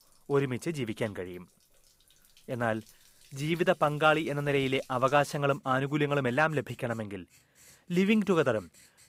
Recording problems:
household noises; faint; throughout; 30 dB below the speech

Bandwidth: 15.5 kHz